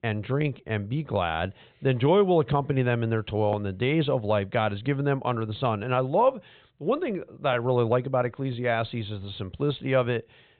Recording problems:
high frequencies cut off; severe; nothing above 3.5 kHz

